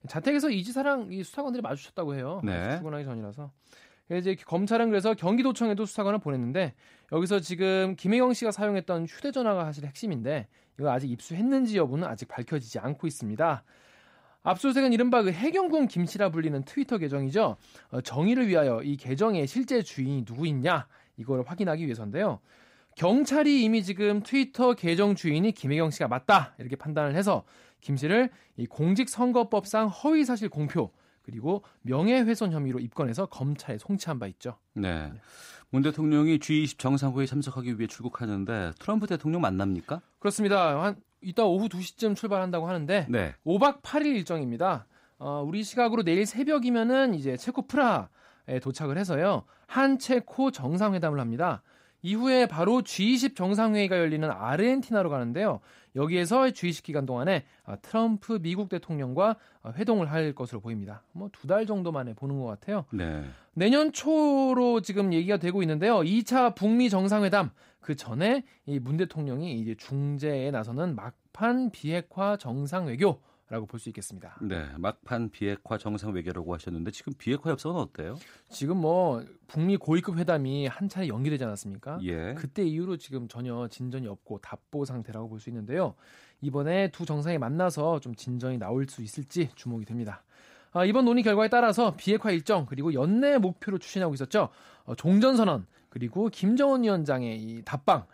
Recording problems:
none

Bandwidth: 15.5 kHz